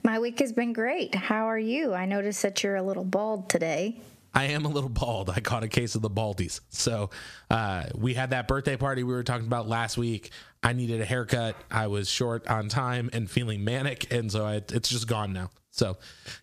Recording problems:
squashed, flat; somewhat

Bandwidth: 14.5 kHz